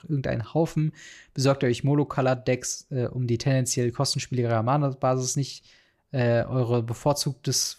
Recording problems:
none

